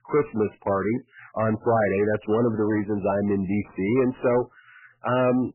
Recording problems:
garbled, watery; badly; nothing above 2.5 kHz
distortion; slight; 10 dB below the speech

